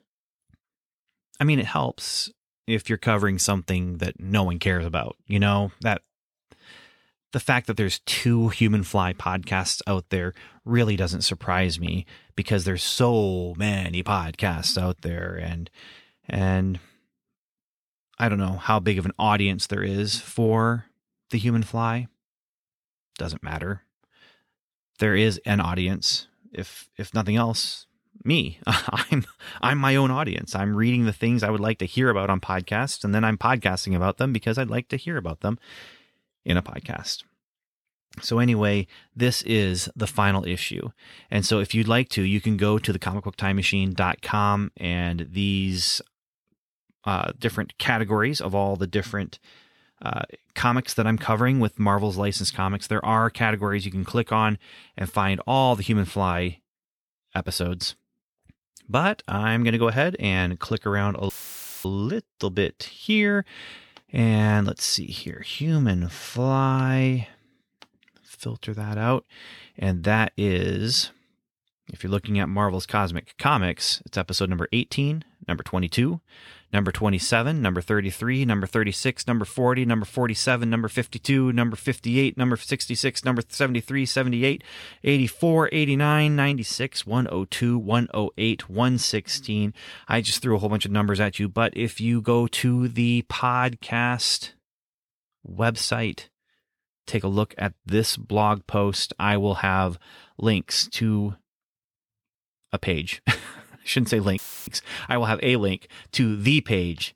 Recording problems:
audio cutting out; filled with static; at 1:01 for 0.5 s and at 1:44

